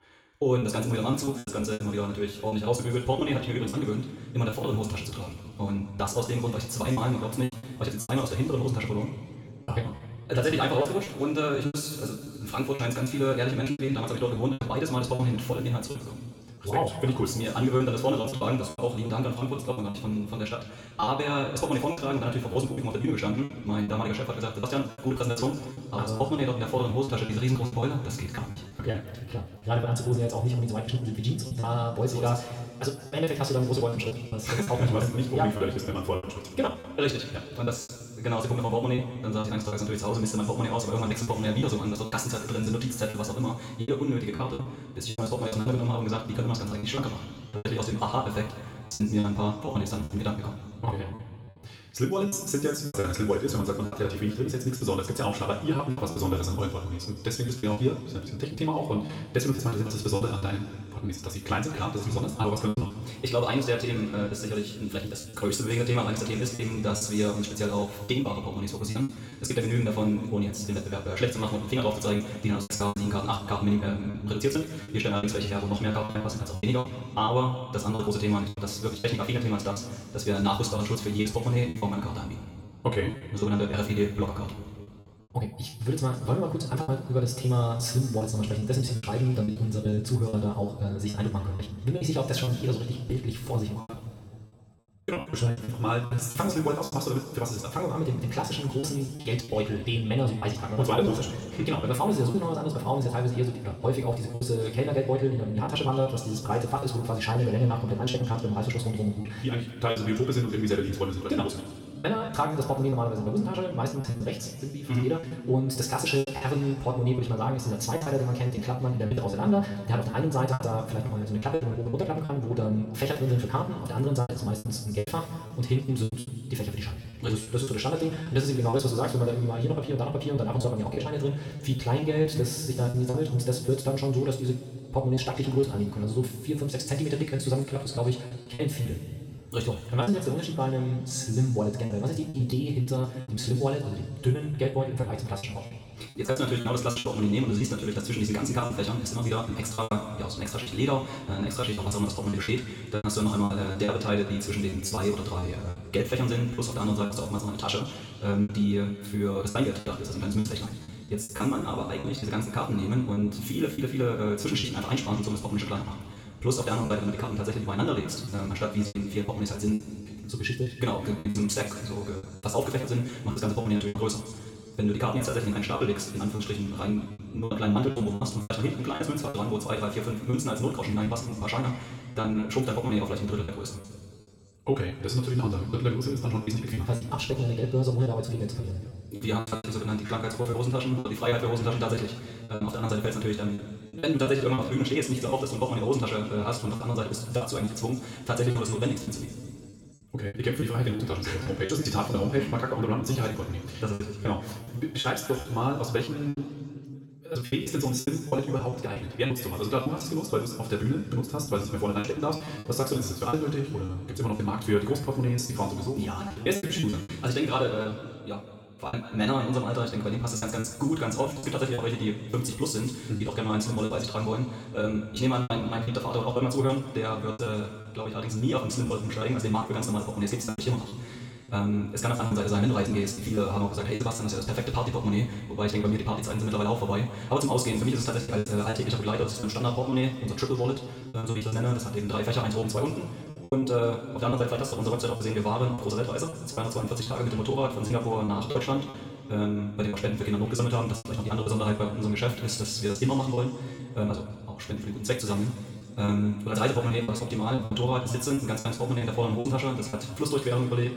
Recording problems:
wrong speed, natural pitch; too fast; 1.7 times normal speed
room echo; noticeable; dies away in 2 s
off-mic speech; somewhat distant
choppy; very; 9% of the speech affected

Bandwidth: 17.5 kHz